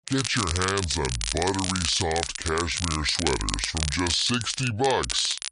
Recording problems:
wrong speed and pitch; too slow and too low; 0.7 times normal speed
crackle, like an old record; loud; 4 dB below the speech

